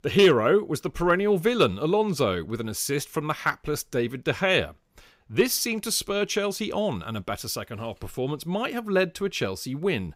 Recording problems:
none

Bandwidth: 15.5 kHz